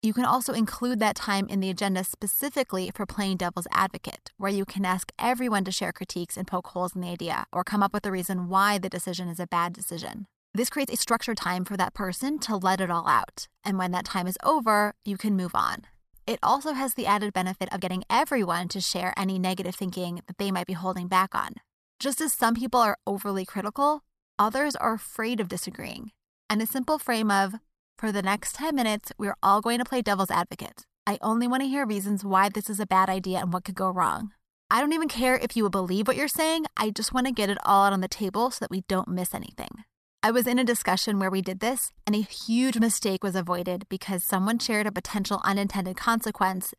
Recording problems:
uneven, jittery; strongly; from 2.5 to 43 s

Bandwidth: 14 kHz